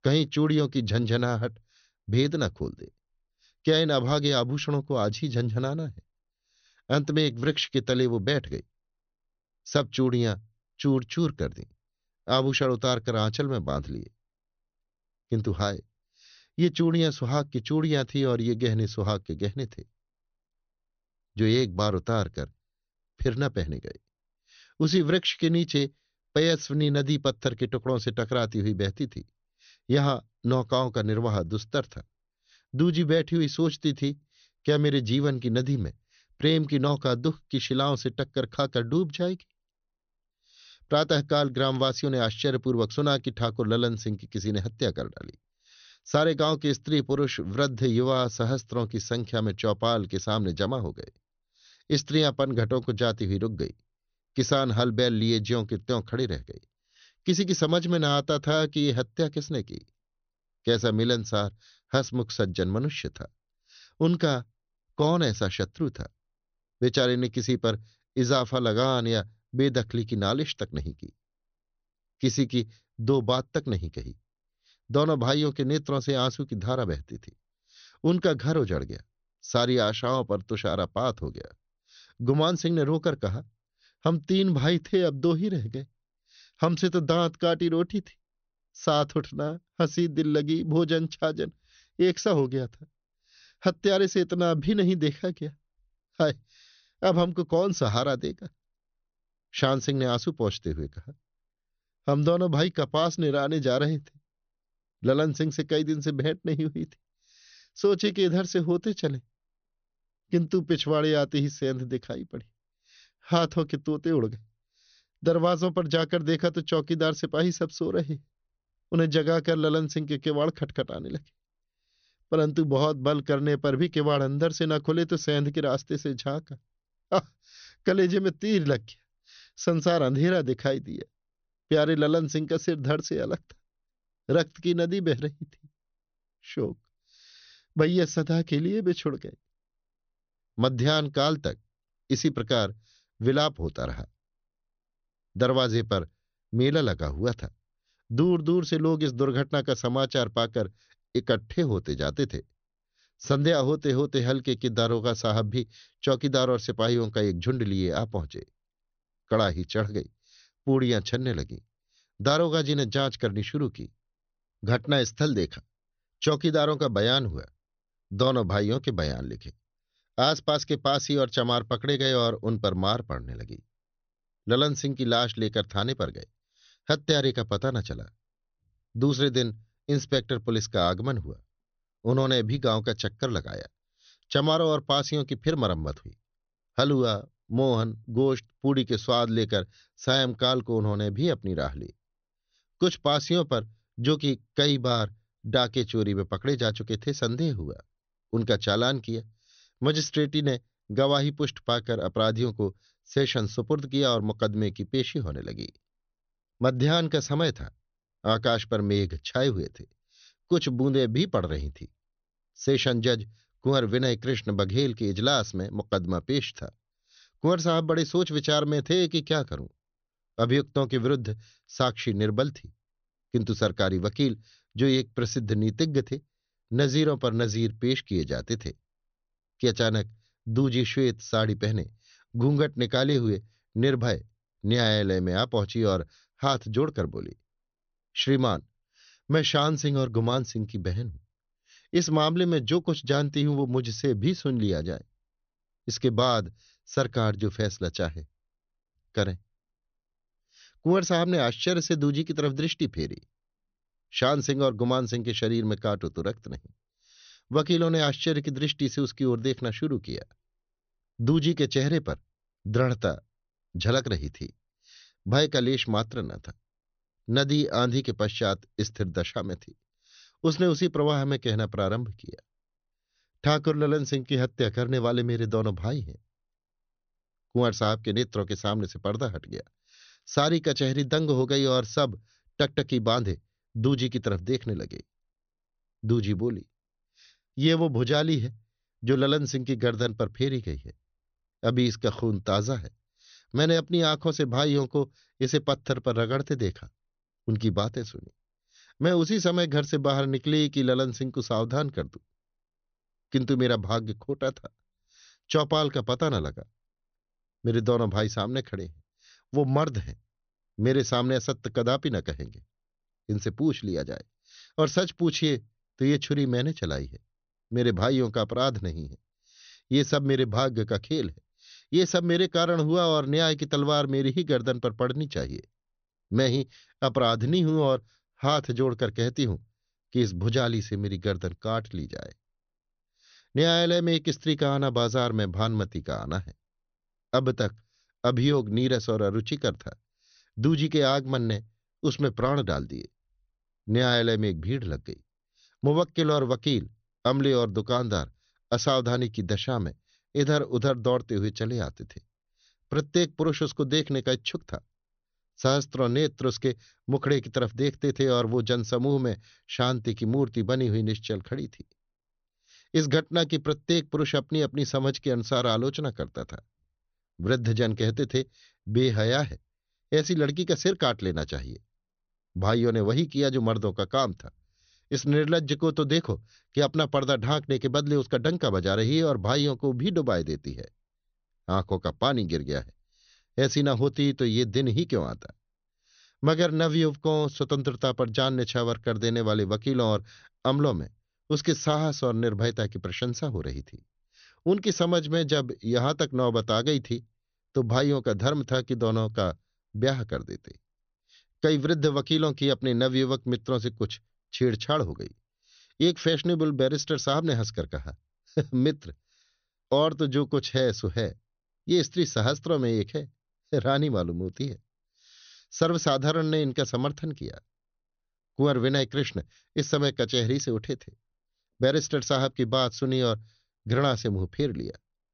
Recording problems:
high frequencies cut off; noticeable; nothing above 6 kHz

